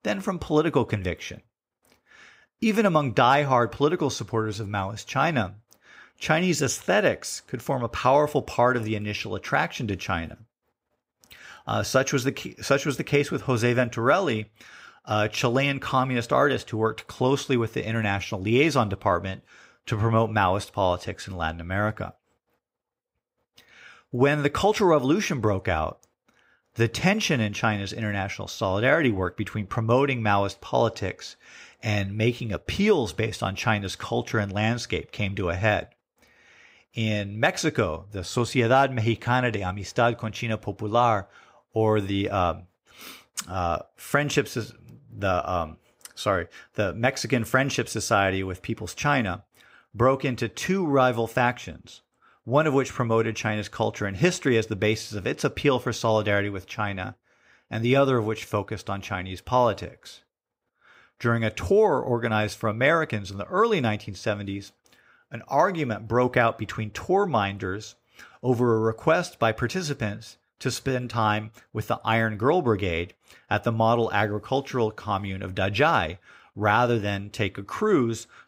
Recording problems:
none

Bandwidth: 15.5 kHz